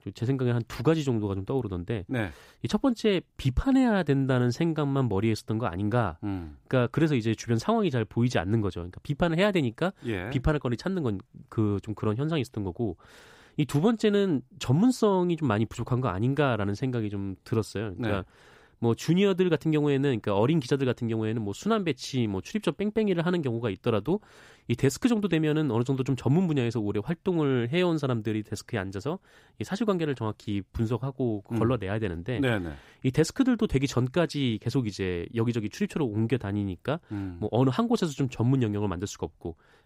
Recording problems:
none

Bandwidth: 15.5 kHz